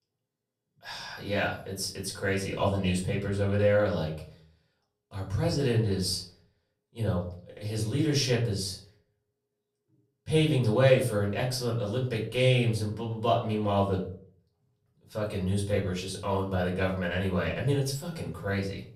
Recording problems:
off-mic speech; far
room echo; slight; dies away in 0.4 s

